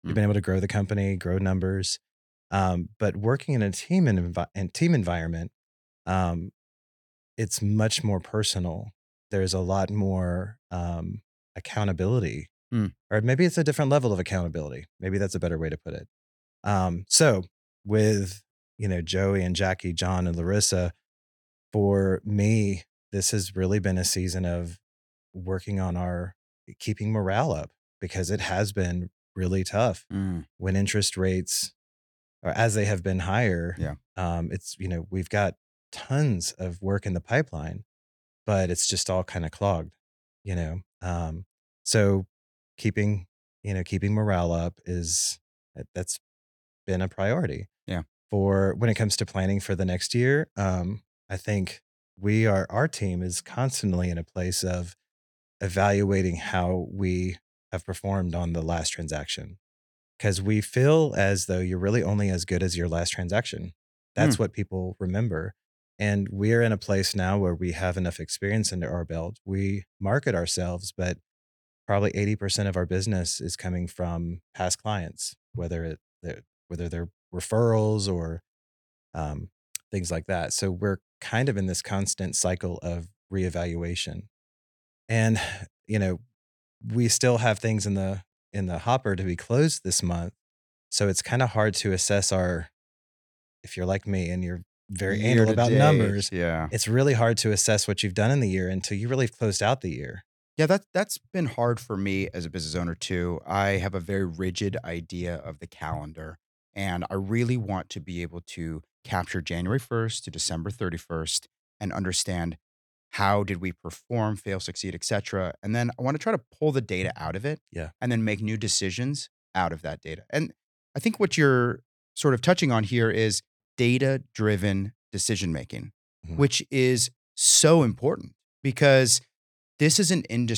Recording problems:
abrupt cut into speech; at the end

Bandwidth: 18 kHz